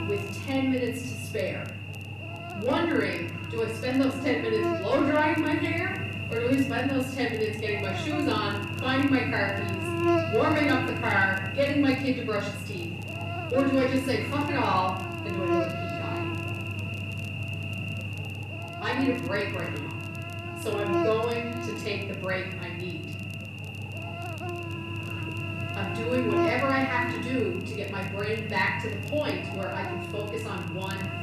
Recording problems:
off-mic speech; far
room echo; noticeable; dies away in 0.7 s
electrical hum; loud; throughout; 50 Hz, 6 dB below the speech
crackle, like an old record; faint; 25 dB below the speech

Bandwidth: 13.5 kHz